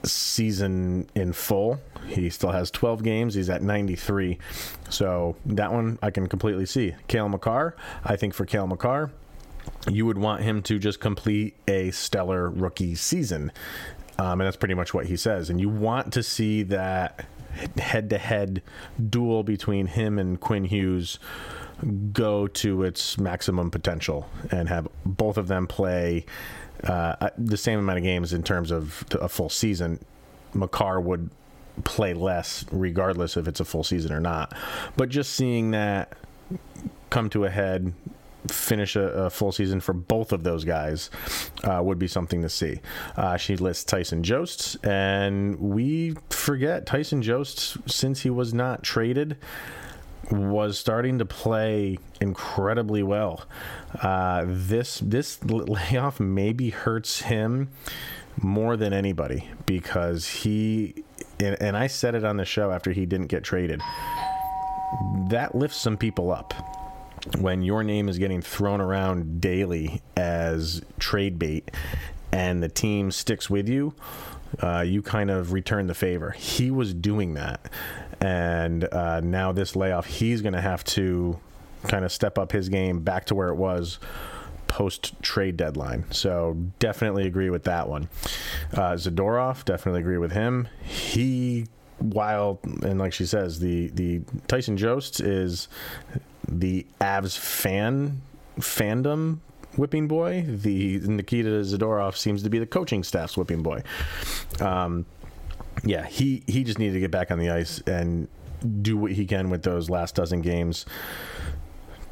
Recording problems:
squashed, flat; somewhat
doorbell; noticeable; from 1:04 to 1:07; peak 2 dB below the speech

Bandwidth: 16.5 kHz